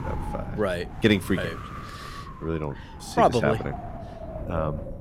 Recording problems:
wind noise on the microphone; occasional gusts; 15 dB below the speech

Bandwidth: 16.5 kHz